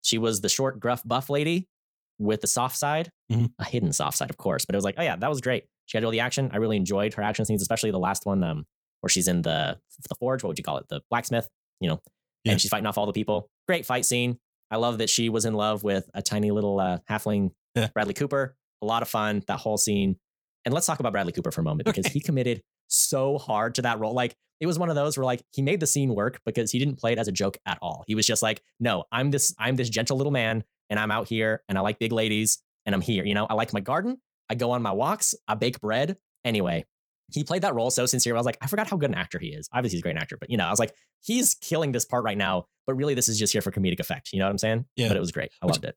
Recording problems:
wrong speed, natural pitch; too fast; 1.5 times normal speed

